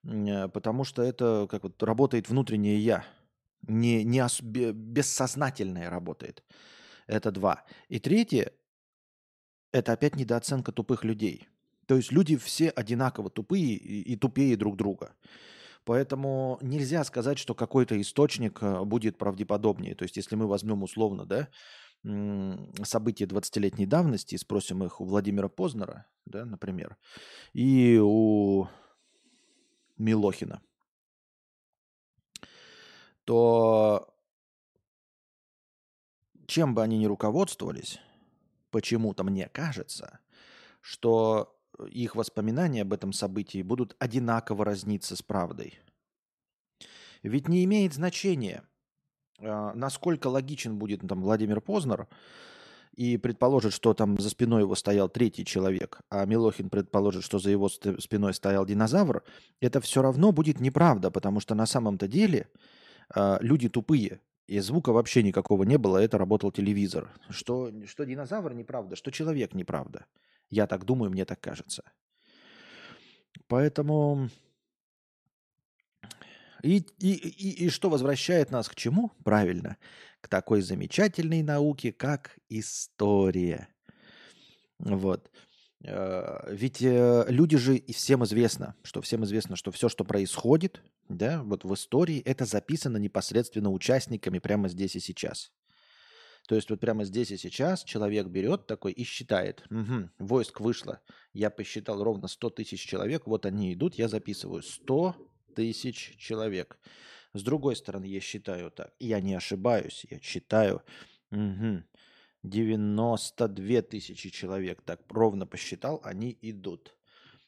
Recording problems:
none

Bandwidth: 13.5 kHz